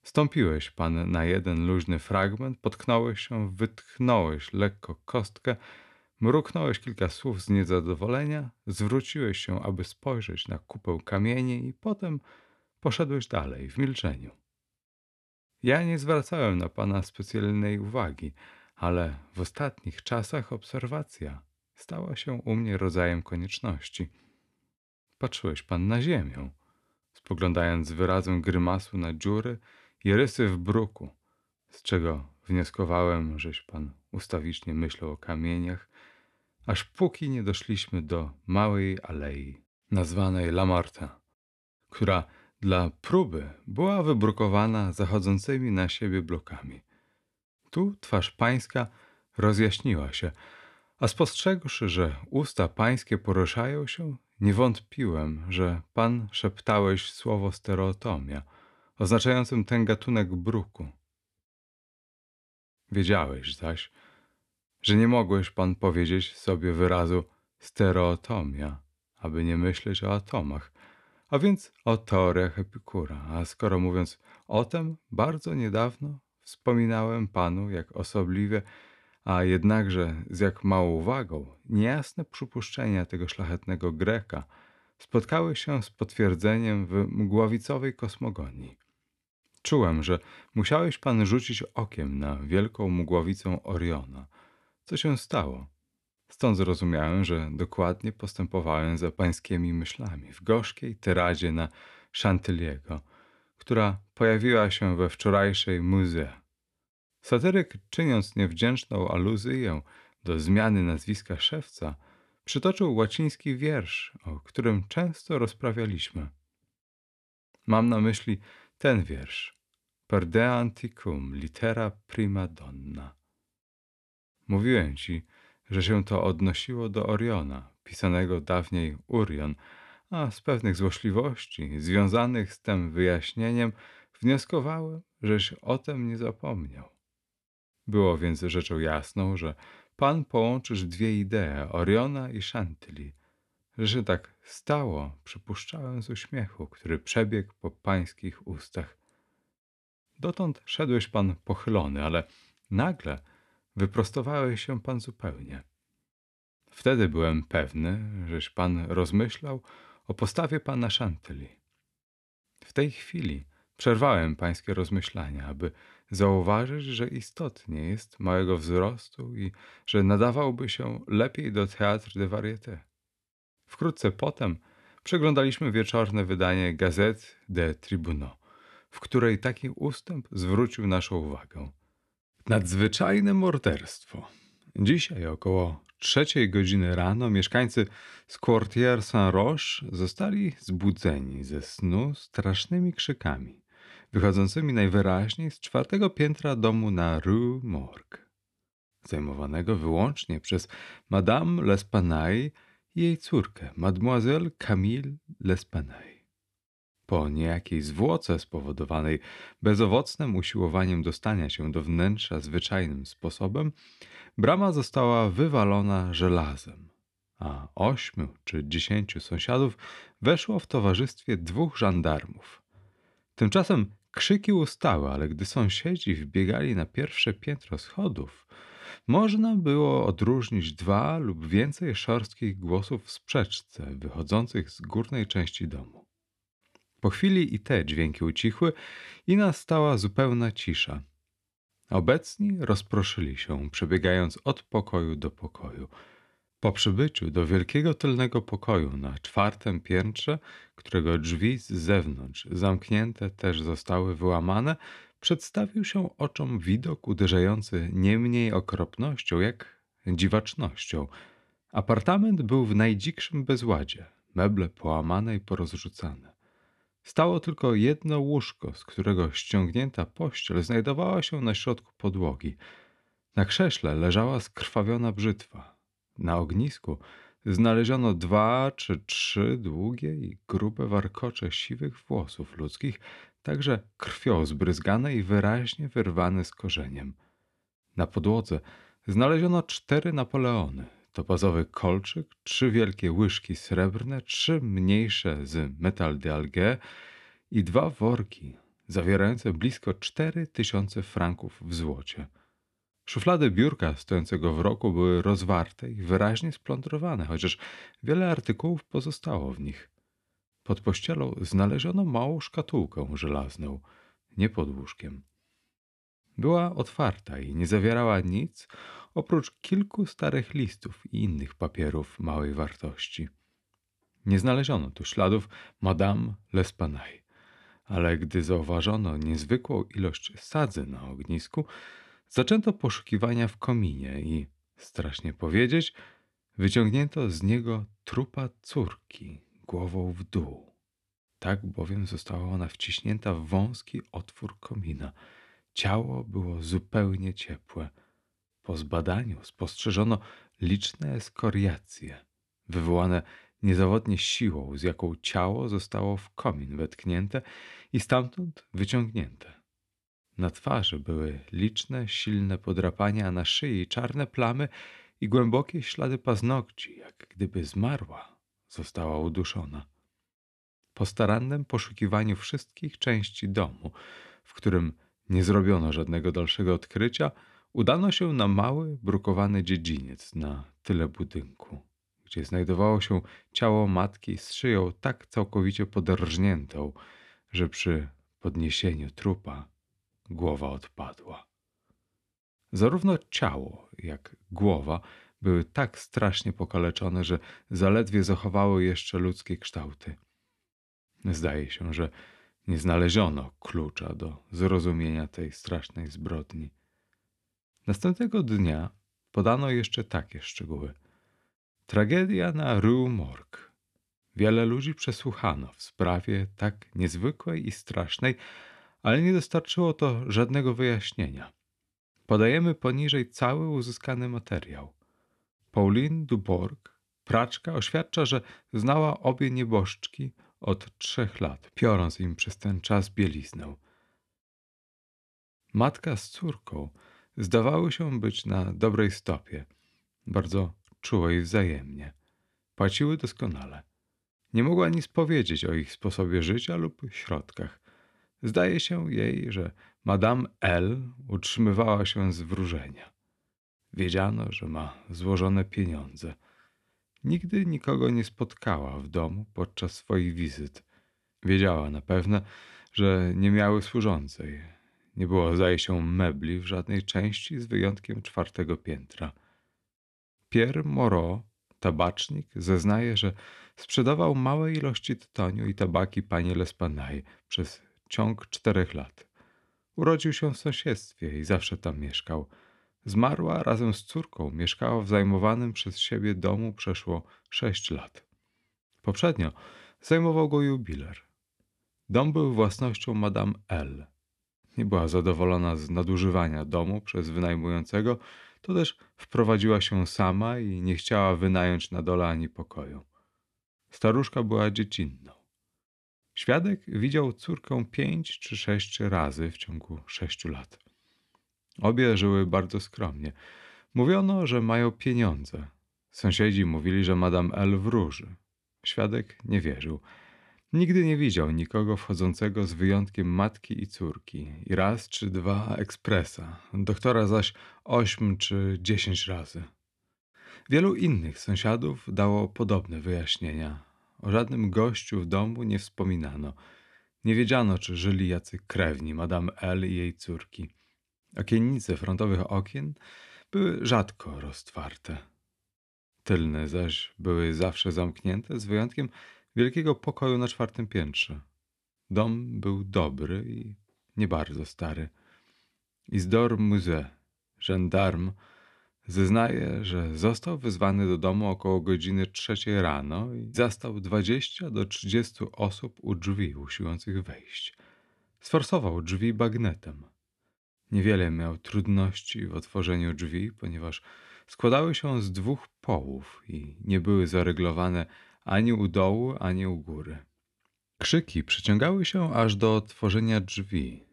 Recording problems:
none

